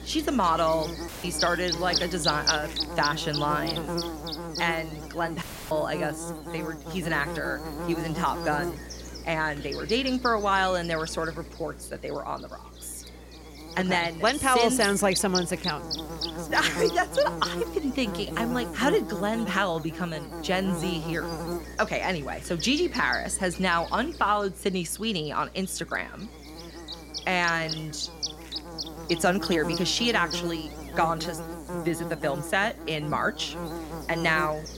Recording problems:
electrical hum; loud; throughout; 60 Hz, 8 dB below the speech
audio cutting out; filled with static; at 1 s and at 5.5 s

